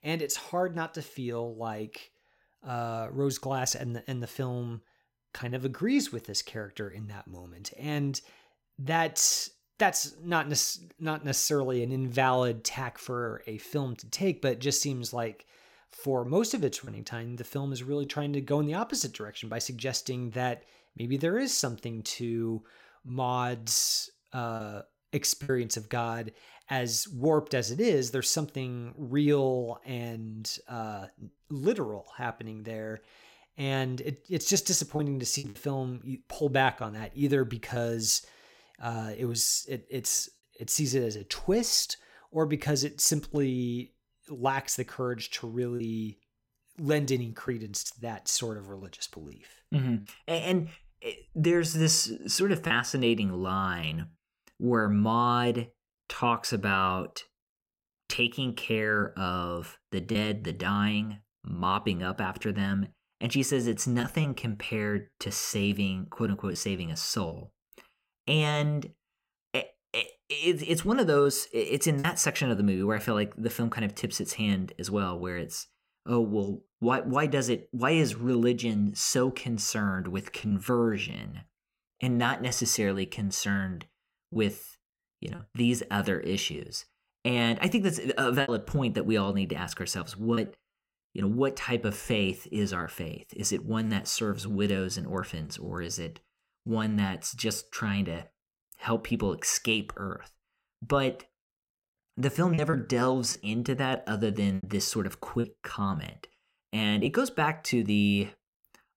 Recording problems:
choppy; occasionally; 2% of the speech affected

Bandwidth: 16.5 kHz